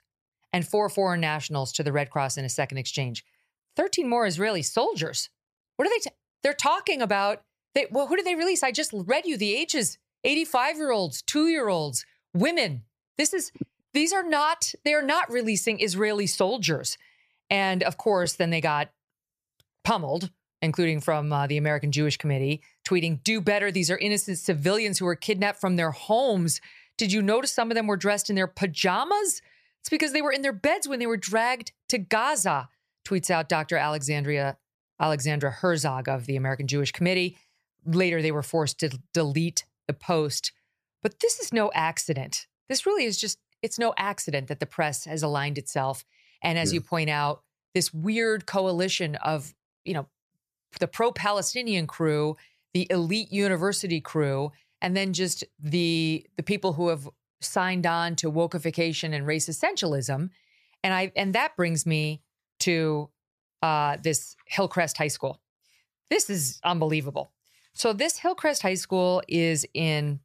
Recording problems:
none

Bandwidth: 14.5 kHz